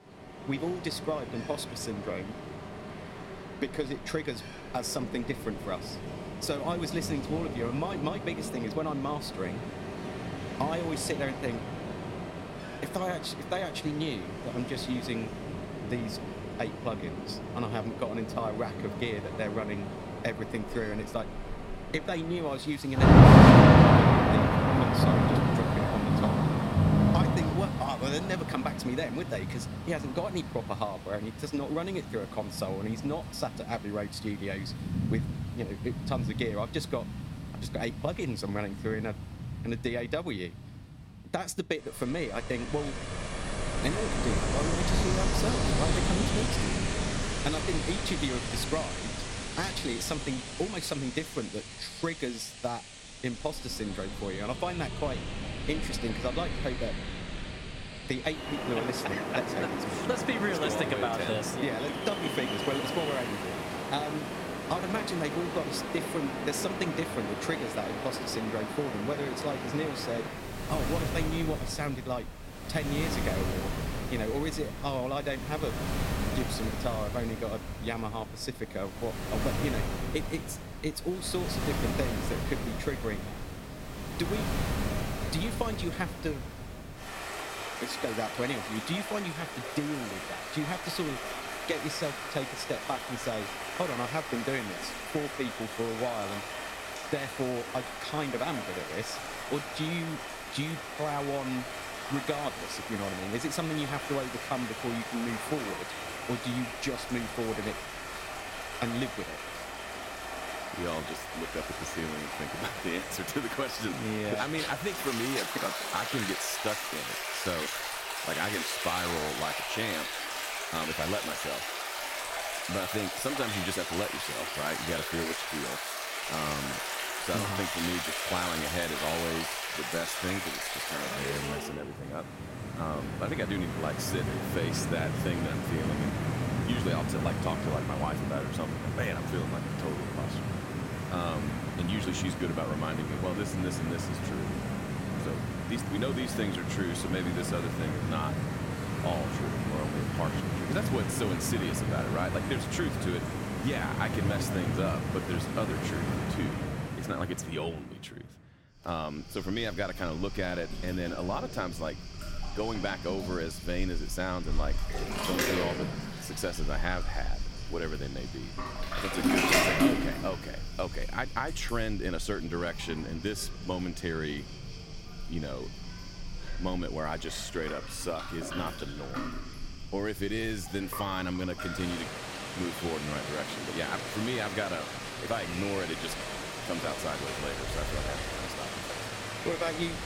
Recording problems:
rain or running water; very loud; throughout; 3 dB above the speech

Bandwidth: 16 kHz